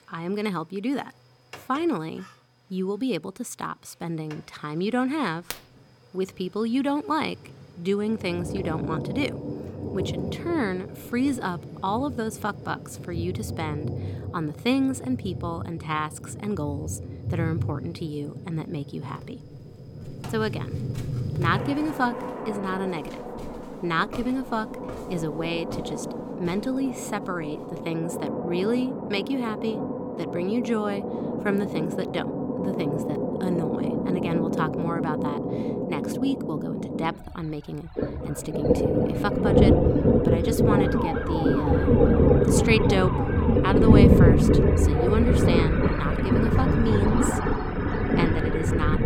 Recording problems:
rain or running water; very loud; throughout; 4 dB above the speech
footsteps; faint; from 19 to 28 s; peak 10 dB below the speech
siren; noticeable; from 41 to 44 s; peak 3 dB below the speech

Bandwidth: 17 kHz